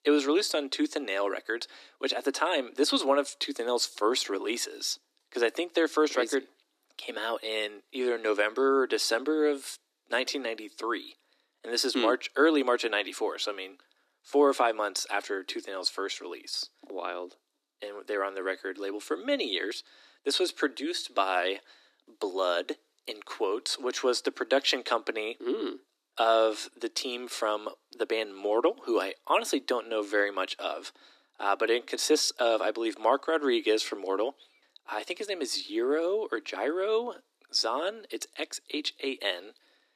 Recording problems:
thin; very slightly; fading below 300 Hz

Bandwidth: 14 kHz